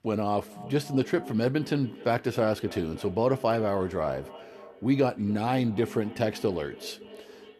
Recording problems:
echo of what is said; noticeable; throughout; 280 ms later, 15 dB below the speech

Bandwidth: 13.5 kHz